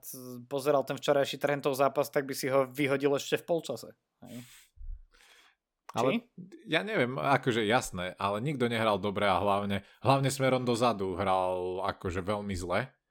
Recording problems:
none

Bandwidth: 17 kHz